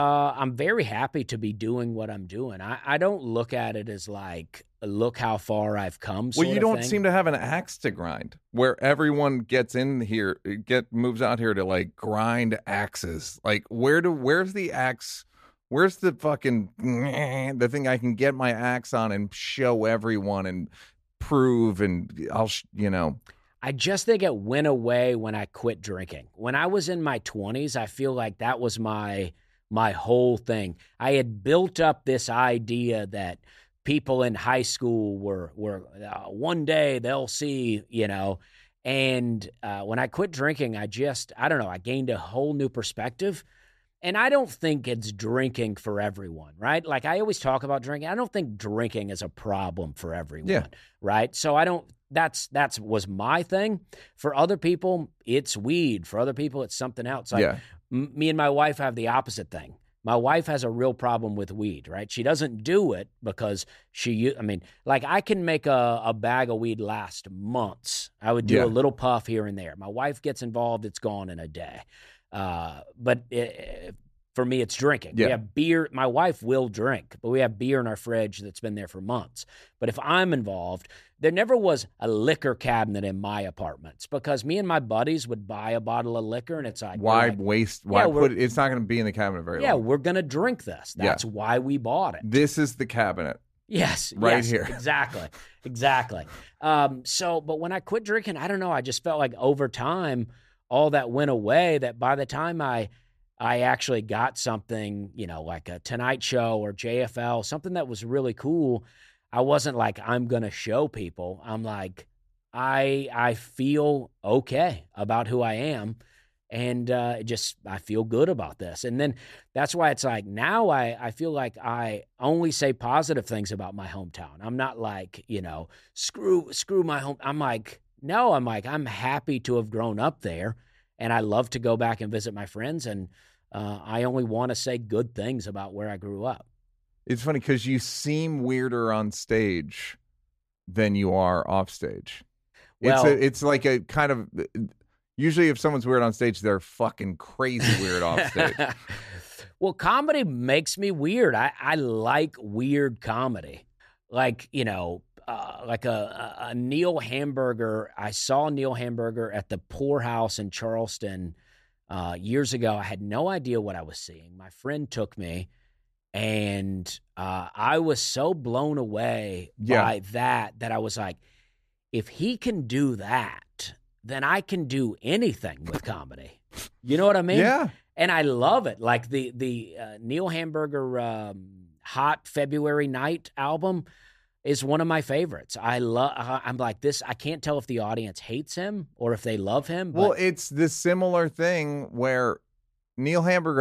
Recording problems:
abrupt cut into speech; at the start and the end

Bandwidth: 14.5 kHz